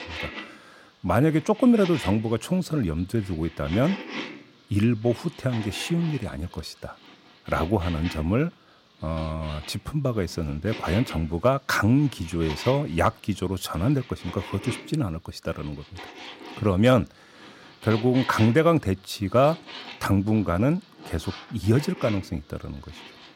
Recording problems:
household noises; noticeable; throughout; 15 dB below the speech

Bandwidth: 16 kHz